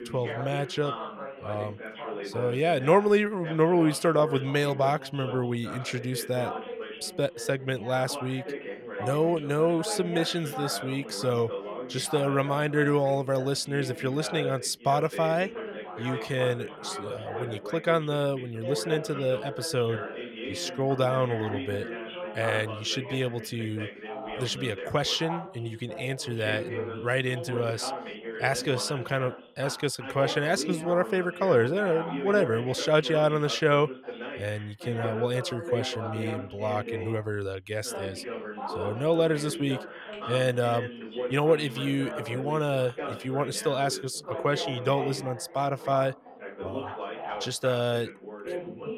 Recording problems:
background chatter; loud; throughout; 2 voices, 9 dB below the speech

